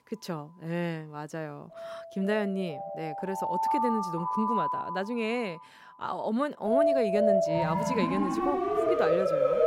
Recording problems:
alarms or sirens; very loud; throughout; 4 dB above the speech

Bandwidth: 16 kHz